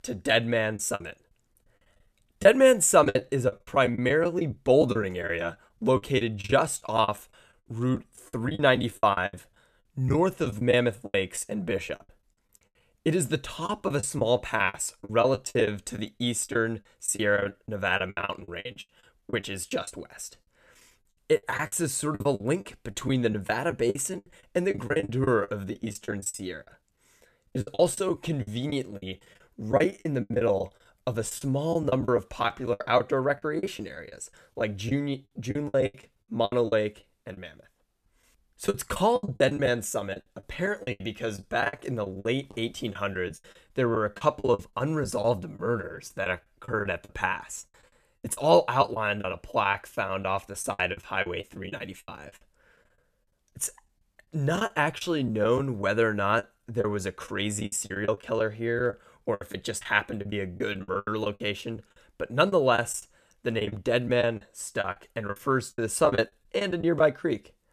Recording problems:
choppy; very; 16% of the speech affected

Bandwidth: 14 kHz